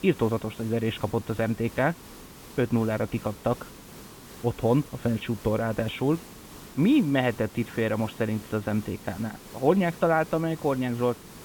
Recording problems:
high frequencies cut off; severe; nothing above 4 kHz
hiss; noticeable; throughout; 15 dB below the speech

